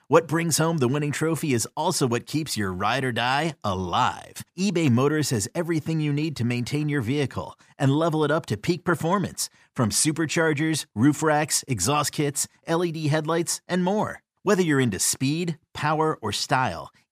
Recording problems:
none

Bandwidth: 15 kHz